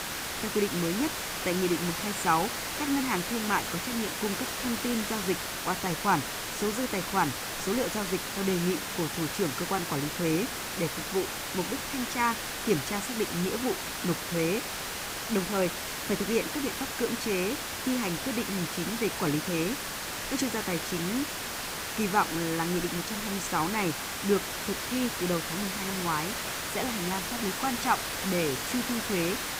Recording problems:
hiss; loud; throughout; 1 dB below the speech

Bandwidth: 15.5 kHz